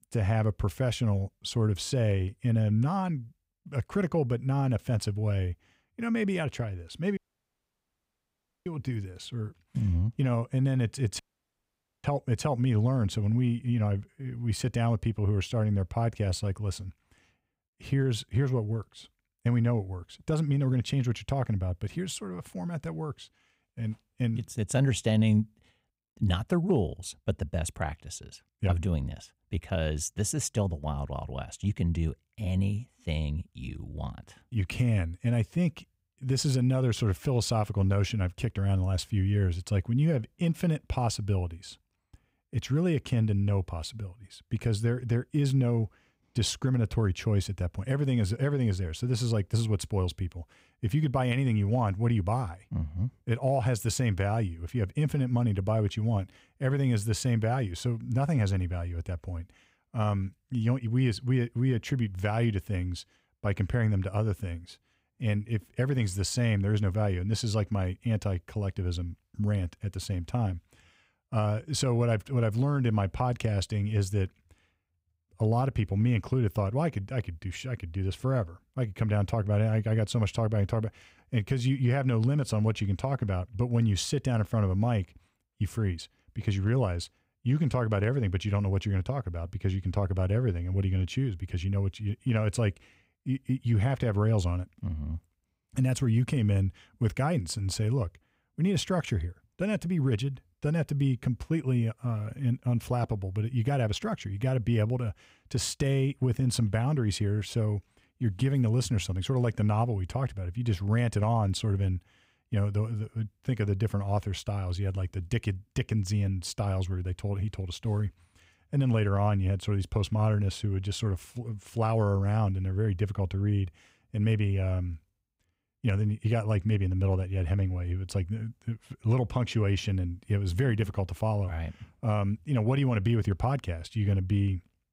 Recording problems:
audio cutting out; at 7 s for 1.5 s and at 11 s for 1 s

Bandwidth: 15.5 kHz